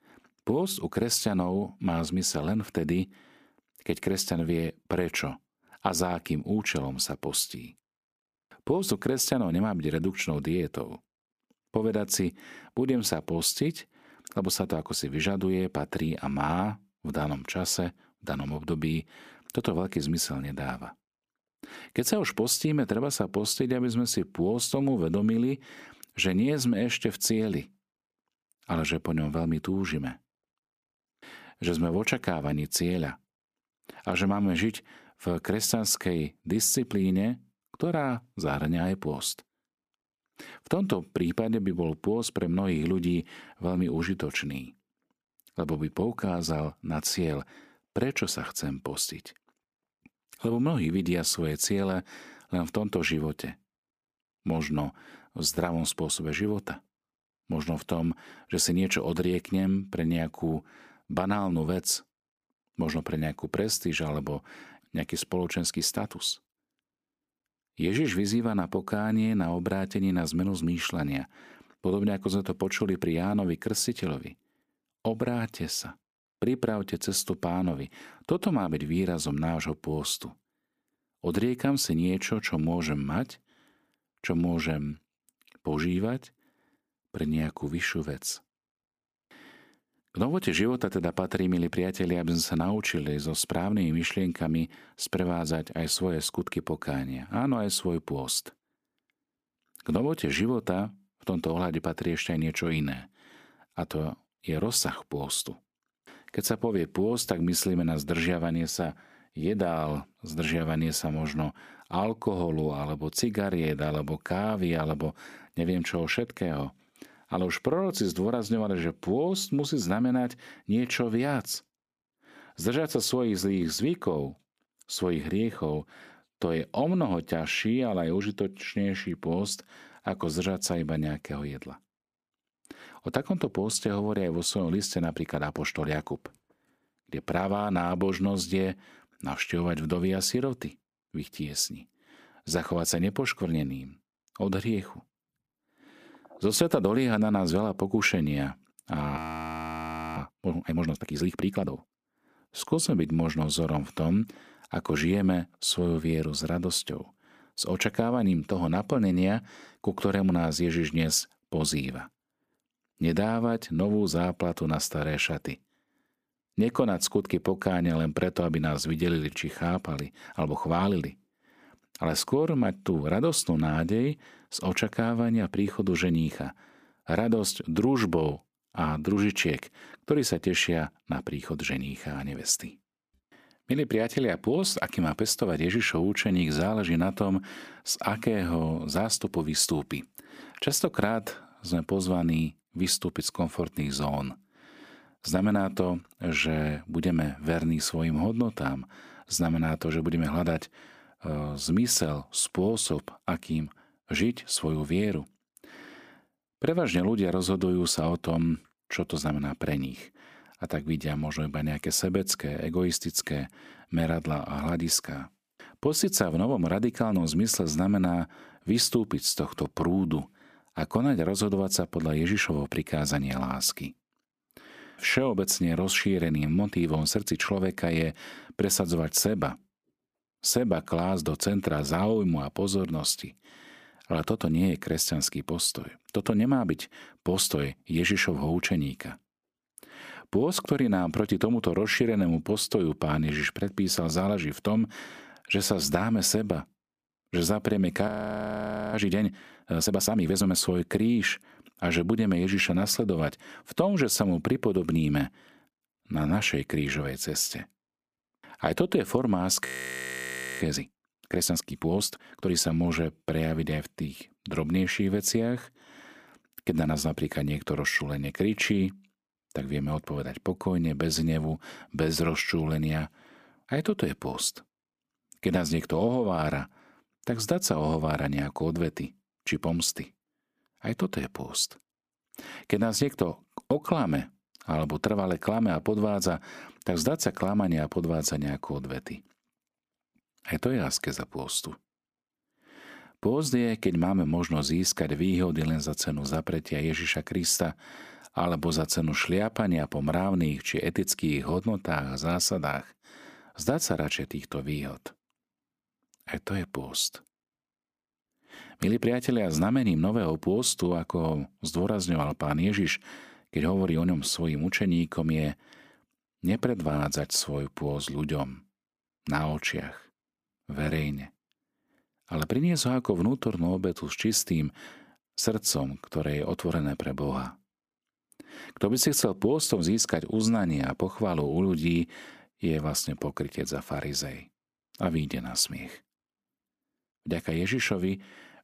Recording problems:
audio freezing; at 2:29 for 1 s, at 4:08 for 1 s and at 4:20 for 1 s

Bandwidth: 15 kHz